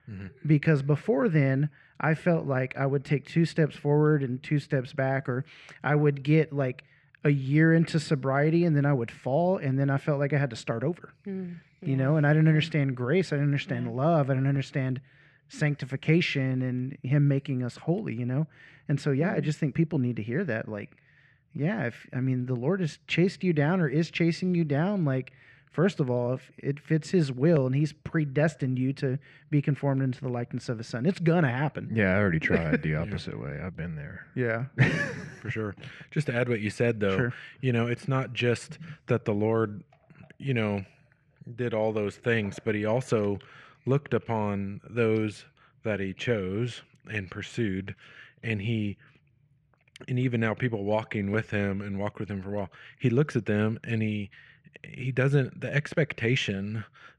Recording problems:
muffled; slightly; fading above 3 kHz

